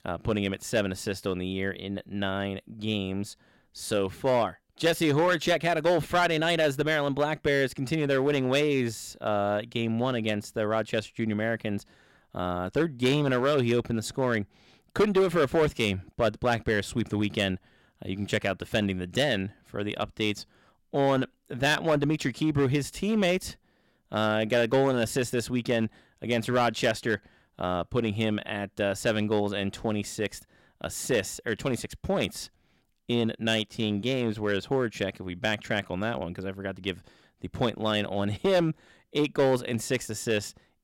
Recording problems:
distortion; slight; 4% of the sound clipped

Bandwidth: 16.5 kHz